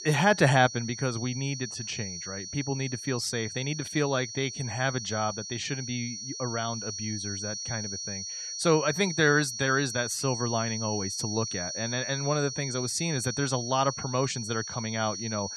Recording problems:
high-pitched whine; loud; throughout; 5.5 kHz, 6 dB below the speech

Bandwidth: 13.5 kHz